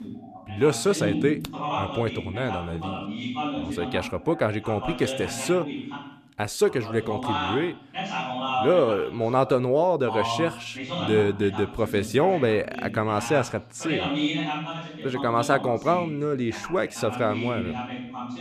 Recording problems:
voice in the background; loud; throughout; 6 dB below the speech

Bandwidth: 14.5 kHz